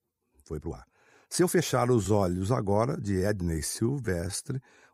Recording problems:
uneven, jittery; strongly; from 0.5 to 4.5 s

